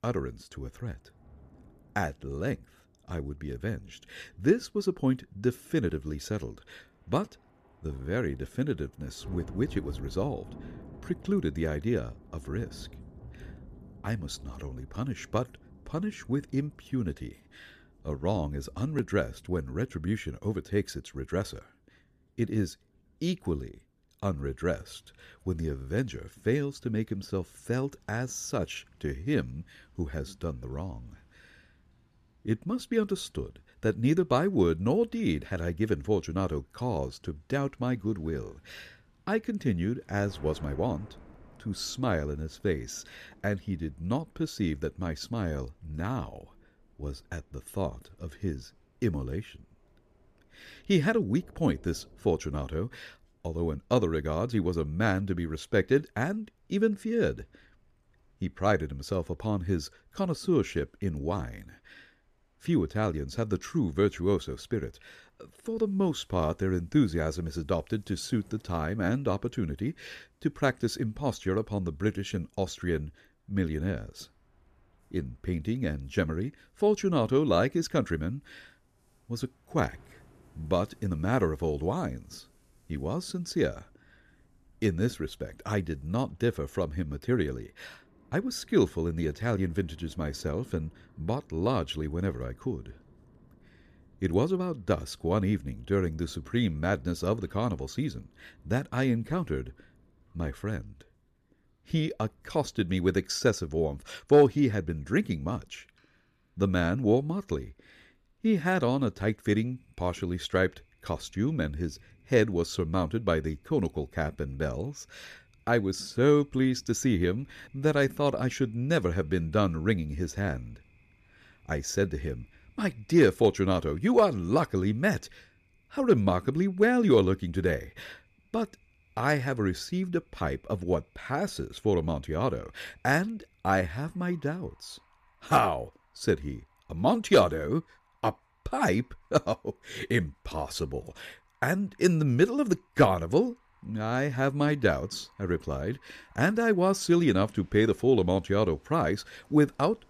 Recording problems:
rain or running water; faint; throughout; 30 dB below the speech

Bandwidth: 14.5 kHz